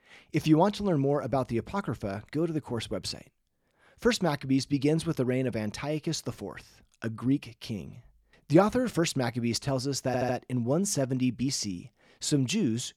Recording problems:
audio stuttering; at 10 s

